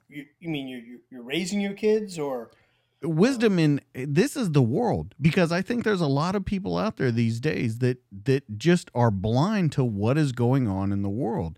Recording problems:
none

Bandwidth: 16 kHz